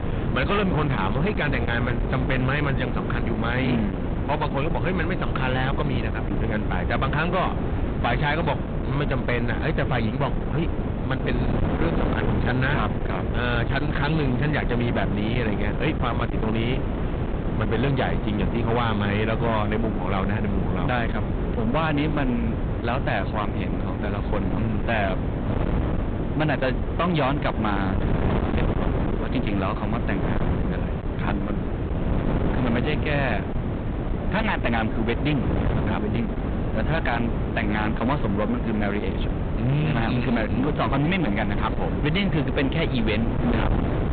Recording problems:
distortion; heavy; 28% of the sound clipped
high frequencies cut off; severe; nothing above 4 kHz
wind noise on the microphone; heavy; 5 dB below the speech

